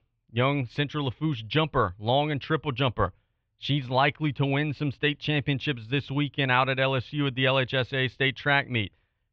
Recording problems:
muffled; very; fading above 3 kHz

